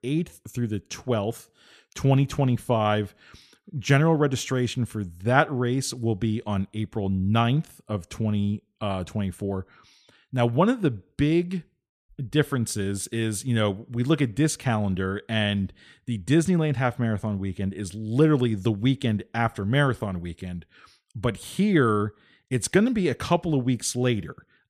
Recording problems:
none

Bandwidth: 14.5 kHz